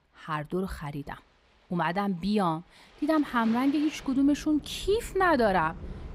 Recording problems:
rain or running water; noticeable; throughout; 15 dB below the speech

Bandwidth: 15.5 kHz